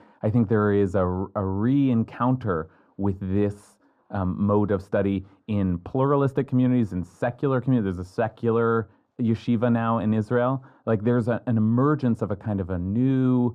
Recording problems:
muffled; very; fading above 1.5 kHz

